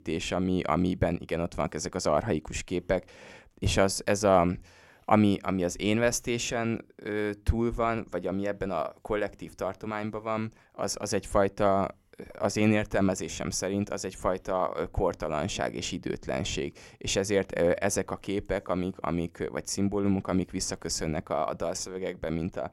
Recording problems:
none

